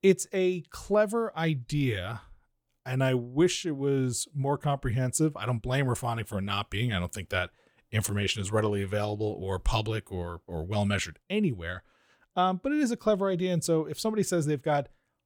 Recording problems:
none

